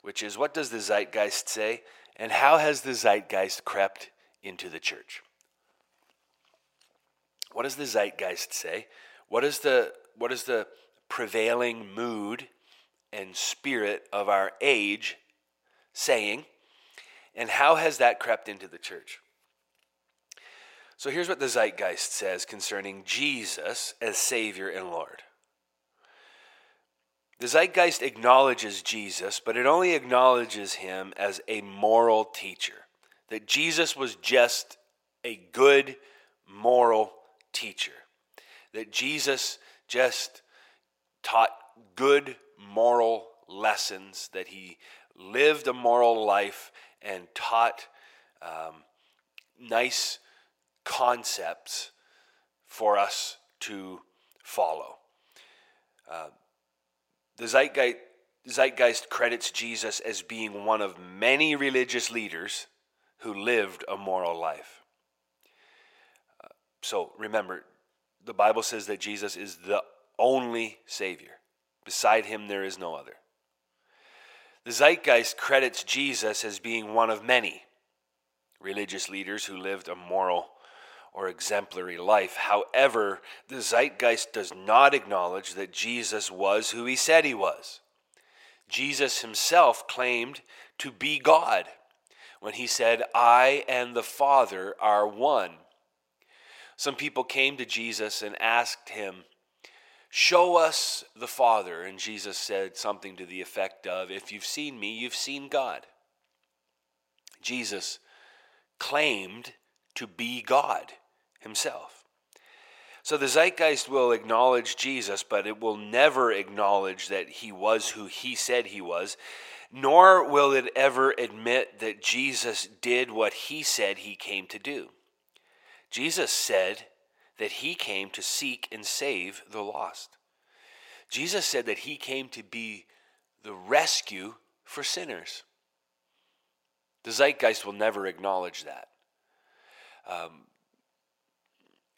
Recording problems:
thin; very; fading below 550 Hz

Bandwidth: 16 kHz